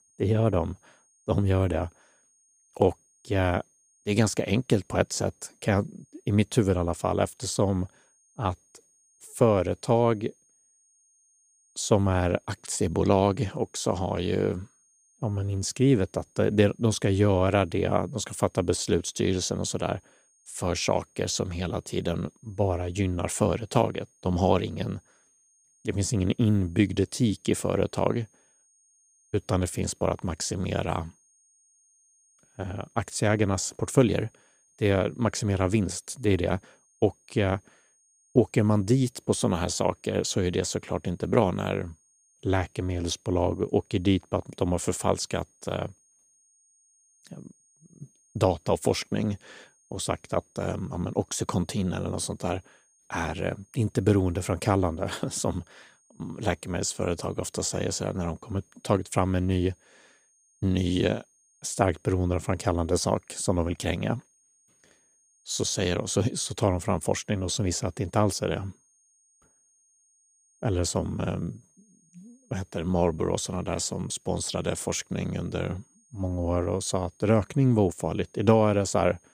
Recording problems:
high-pitched whine; faint; throughout; 6.5 kHz, 35 dB below the speech

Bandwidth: 15 kHz